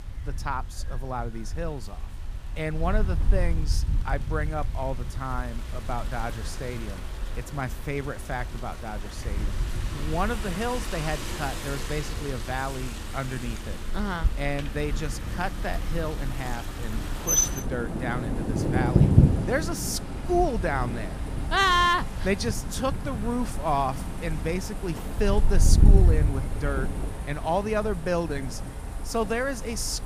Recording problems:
rain or running water; loud; throughout; 1 dB below the speech
wind noise on the microphone; occasional gusts; 20 dB below the speech

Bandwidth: 15 kHz